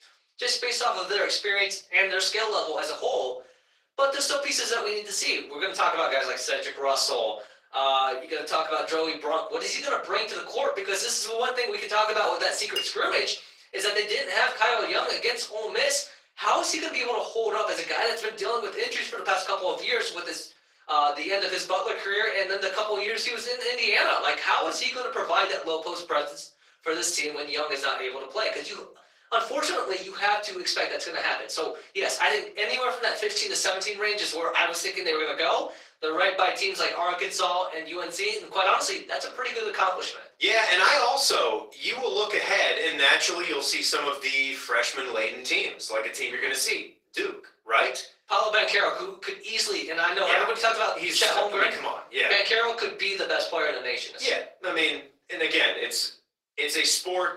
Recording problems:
off-mic speech; far
thin; very; fading below 450 Hz
room echo; slight; dies away in 0.3 s
garbled, watery; slightly; nothing above 16 kHz
clattering dishes; noticeable; at 13 s; peak 5 dB below the speech

